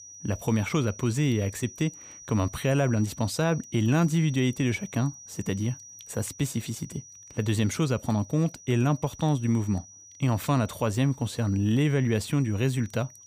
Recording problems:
high-pitched whine; noticeable; throughout; 6 kHz, 20 dB below the speech

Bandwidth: 15 kHz